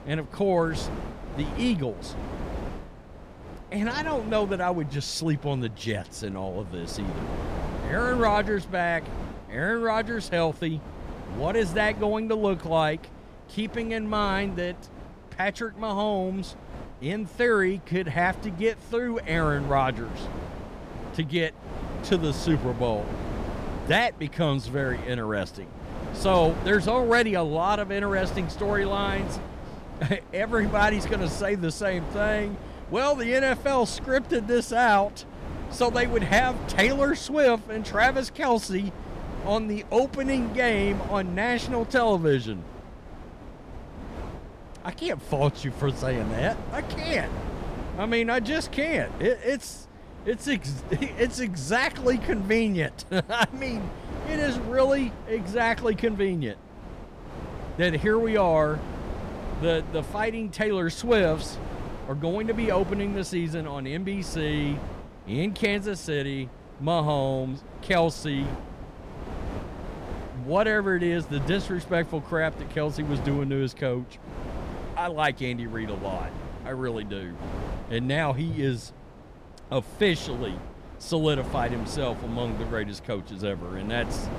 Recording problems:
wind noise on the microphone; occasional gusts; 15 dB below the speech

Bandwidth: 14.5 kHz